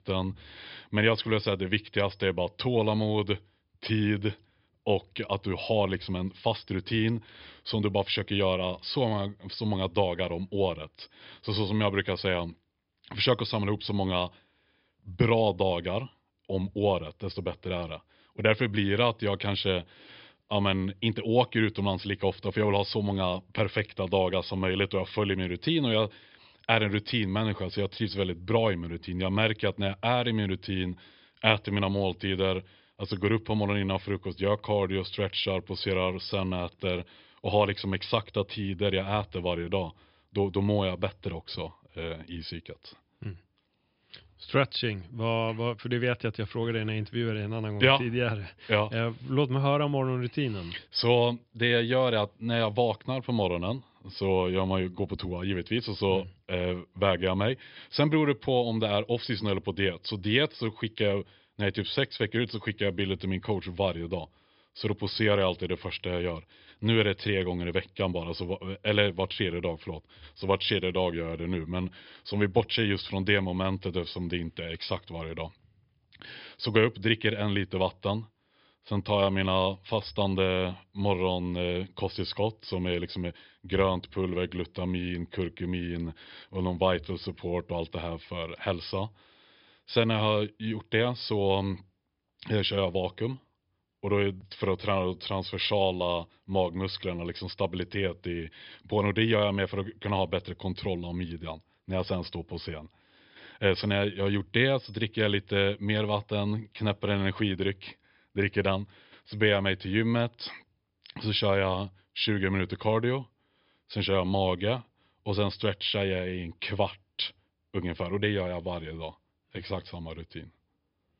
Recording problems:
high frequencies cut off; noticeable; nothing above 5 kHz

